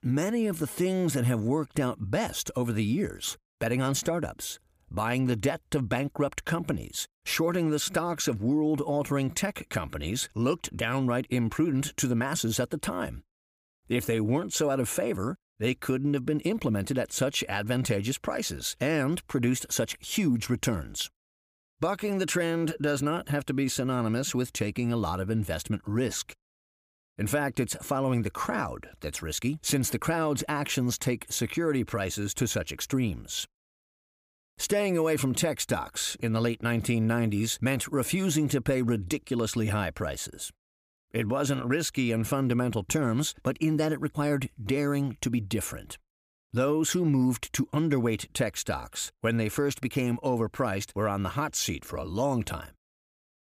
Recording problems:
none

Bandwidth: 15 kHz